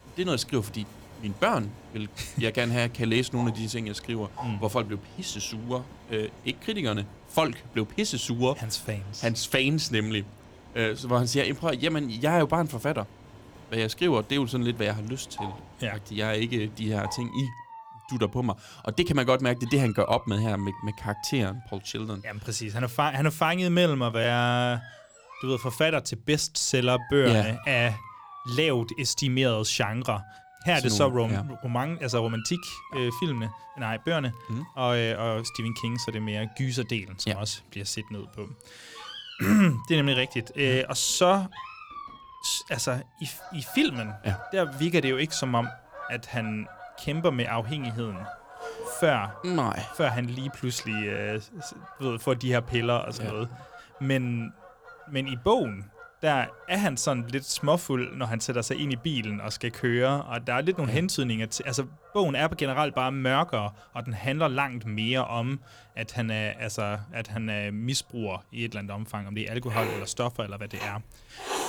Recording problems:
animal sounds; noticeable; throughout; 15 dB below the speech

